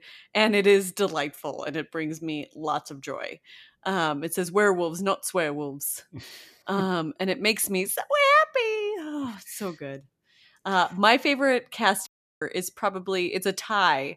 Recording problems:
audio cutting out; at 12 s

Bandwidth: 14.5 kHz